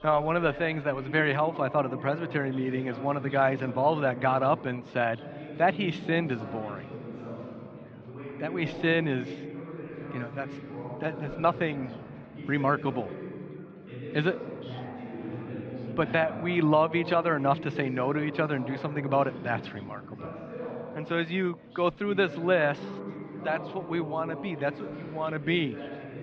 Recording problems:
muffled; slightly; fading above 3.5 kHz
chatter from many people; noticeable; throughout; 10 dB below the speech

